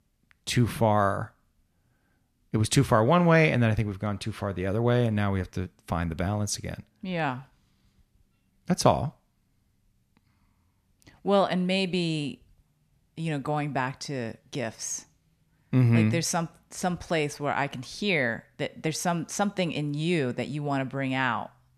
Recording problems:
none

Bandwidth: 14 kHz